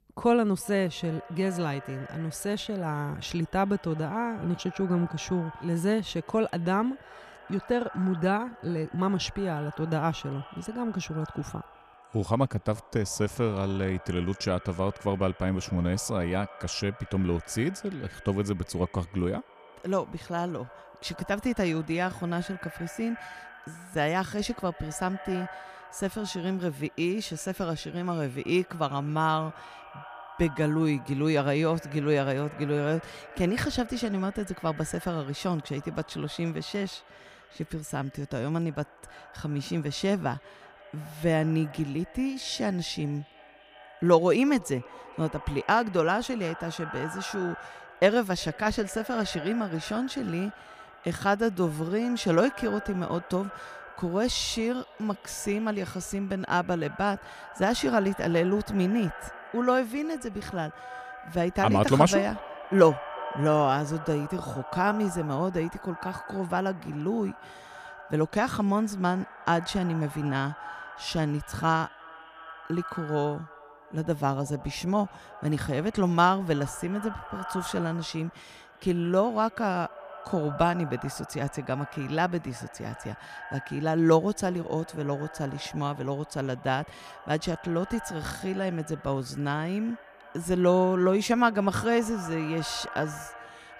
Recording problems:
echo of what is said; noticeable; throughout; 350 ms later, 15 dB below the speech

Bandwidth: 15 kHz